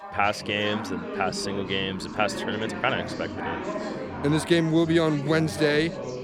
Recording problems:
chatter from many people; loud; throughout; 9 dB below the speech
siren; faint; from 1.5 to 5.5 s; peak 10 dB below the speech

